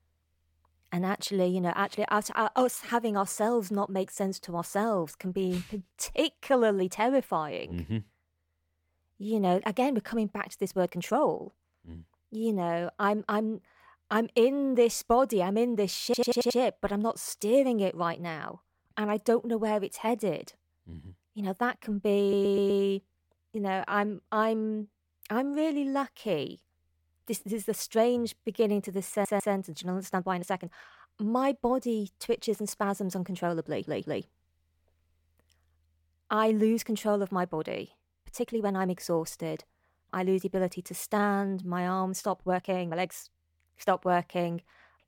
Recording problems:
uneven, jittery; strongly; from 2.5 to 43 s
audio stuttering; 4 times, first at 16 s

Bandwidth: 17 kHz